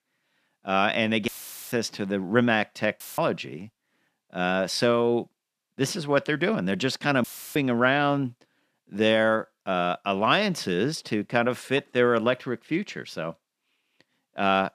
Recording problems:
audio cutting out; filled with static; at 1.5 s, at 3 s and at 7 s

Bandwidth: 14.5 kHz